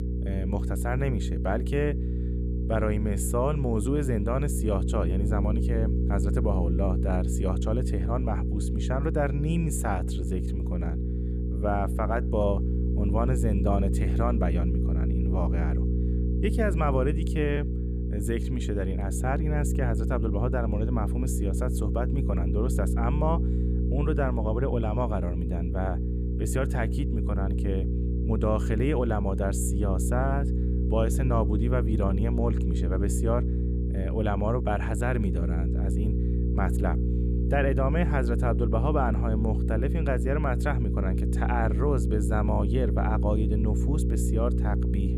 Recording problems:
electrical hum; loud; throughout; 60 Hz, 7 dB below the speech

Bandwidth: 15 kHz